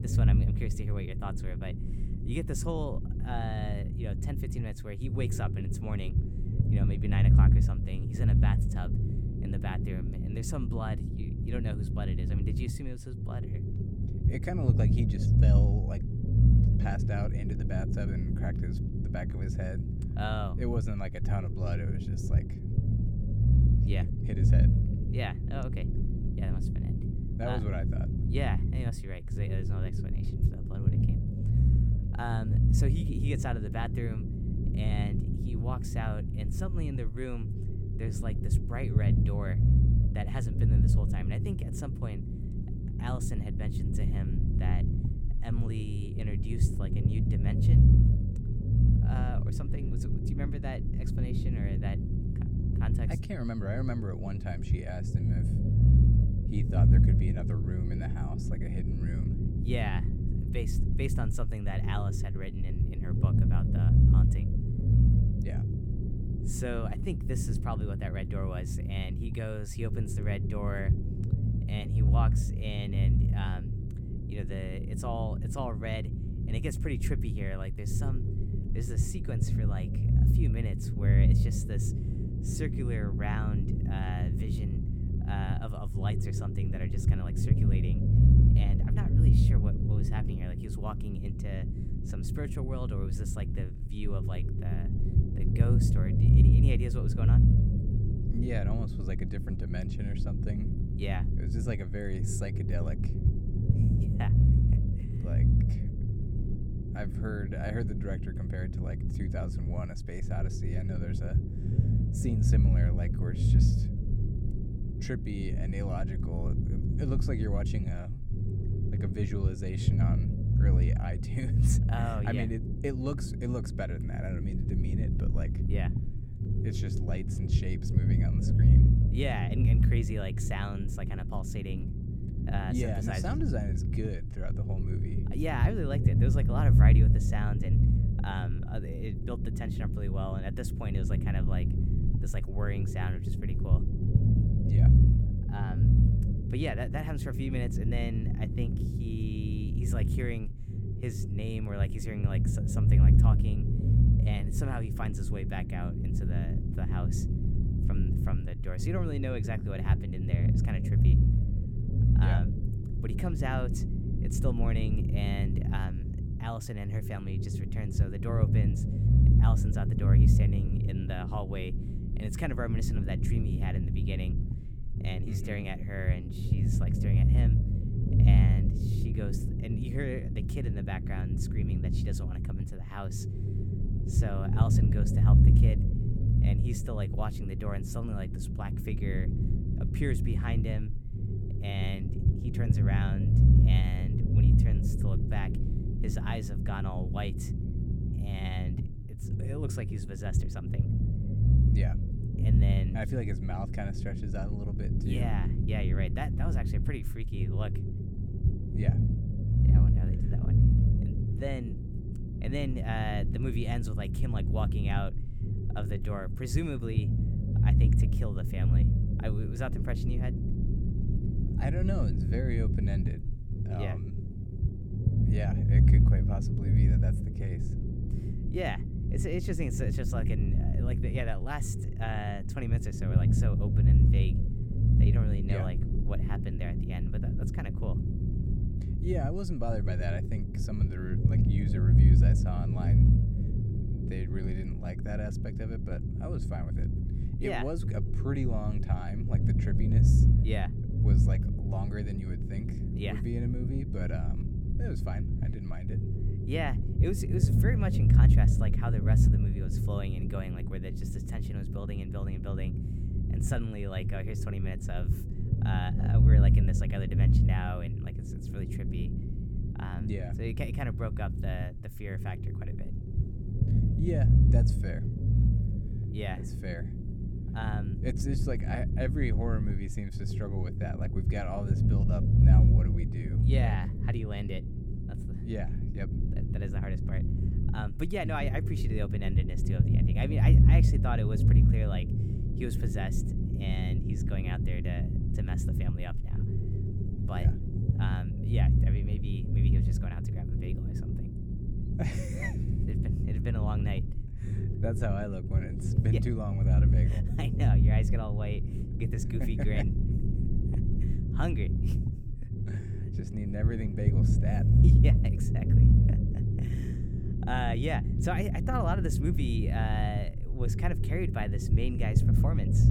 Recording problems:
low rumble; loud; throughout; 1 dB below the speech

